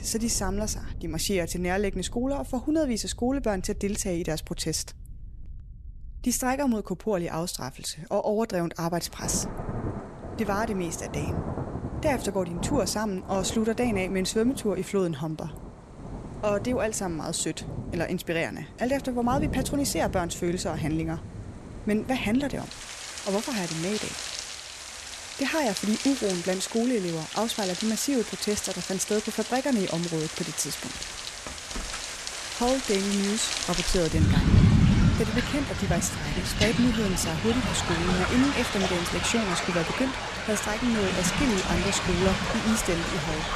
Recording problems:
rain or running water; loud; throughout; 2 dB below the speech

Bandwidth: 13.5 kHz